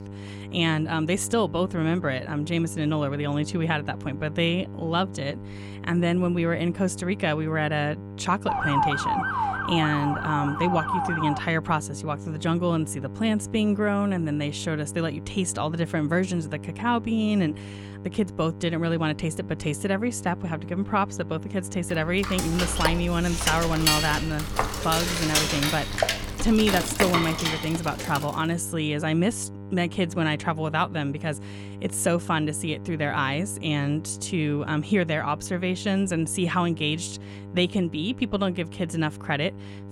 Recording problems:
electrical hum; noticeable; throughout; 50 Hz, 15 dB below the speech
siren; loud; from 8.5 to 11 s; peak 2 dB above the speech
clattering dishes; loud; from 22 to 28 s; peak 4 dB above the speech

